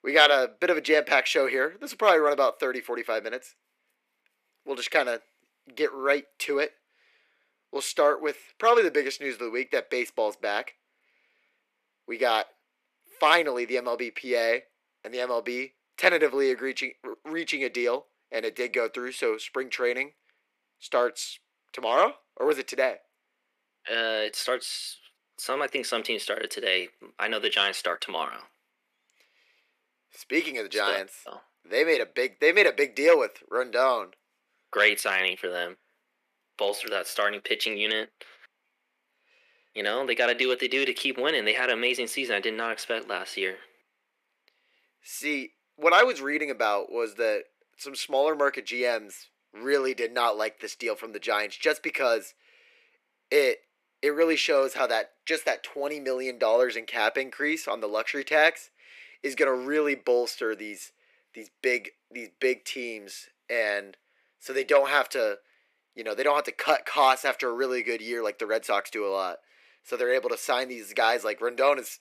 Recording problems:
thin; somewhat; fading below 350 Hz

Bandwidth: 14.5 kHz